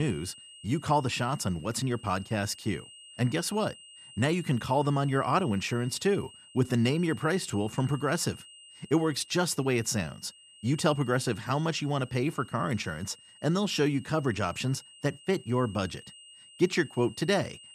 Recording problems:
high-pitched whine; faint; throughout; 3 kHz, 20 dB below the speech
abrupt cut into speech; at the start

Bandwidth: 14.5 kHz